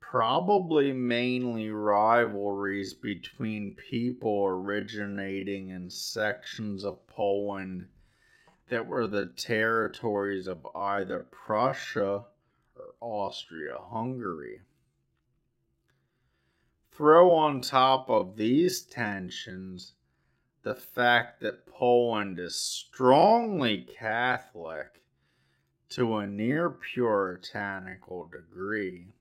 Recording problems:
wrong speed, natural pitch; too slow; 0.6 times normal speed

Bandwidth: 16 kHz